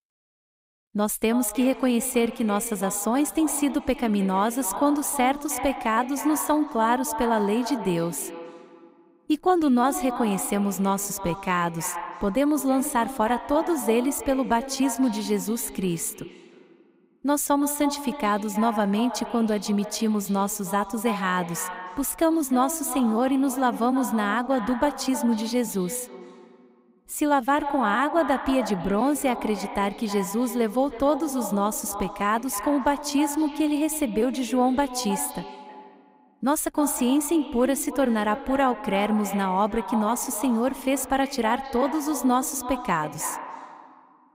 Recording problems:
echo of what is said; strong; throughout; 310 ms later, 10 dB below the speech

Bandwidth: 15.5 kHz